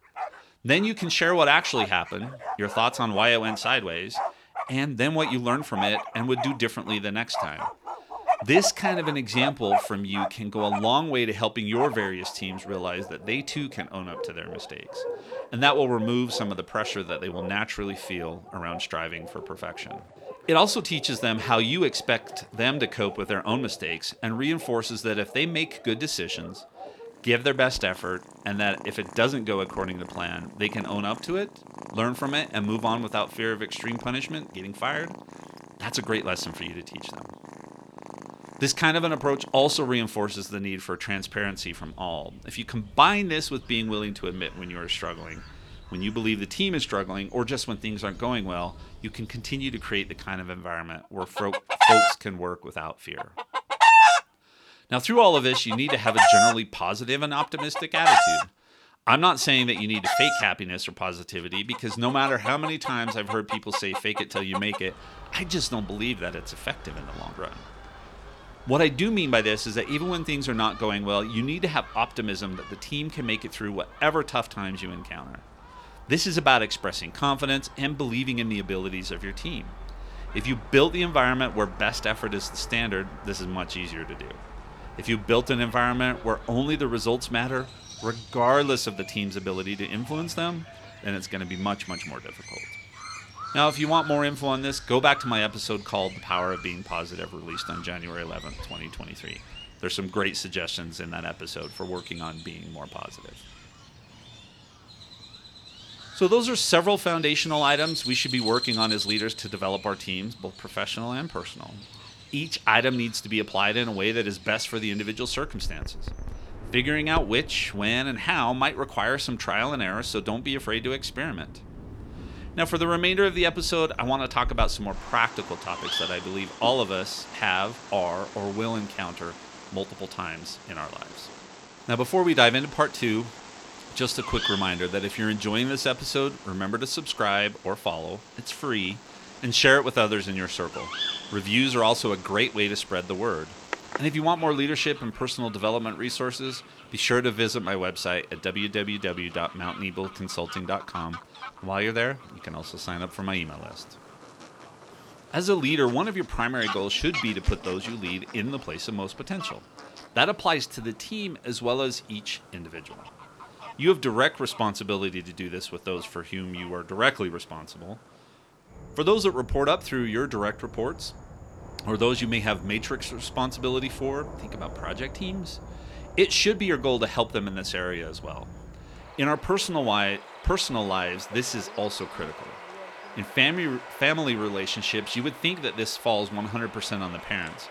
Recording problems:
animal sounds; loud; throughout; 5 dB below the speech

